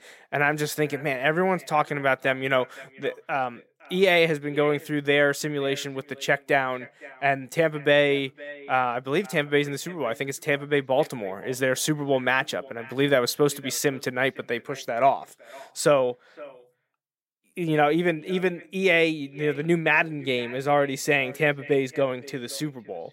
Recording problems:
echo of what is said; faint; throughout; 510 ms later, 20 dB below the speech

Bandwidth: 16 kHz